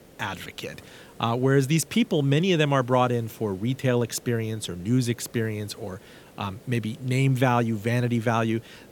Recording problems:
hiss; faint; throughout; 25 dB below the speech

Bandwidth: 18 kHz